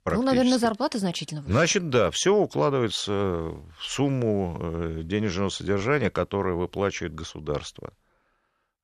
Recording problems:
none

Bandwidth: 13.5 kHz